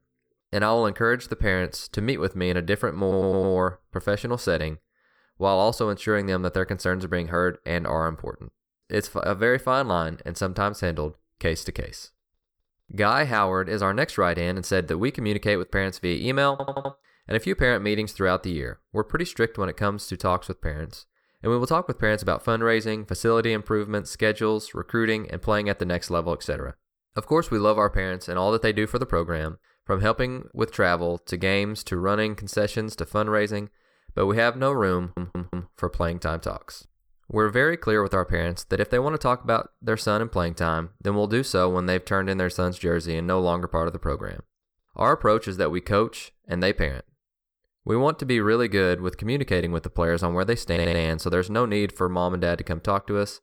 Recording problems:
audio stuttering; 4 times, first at 3 s

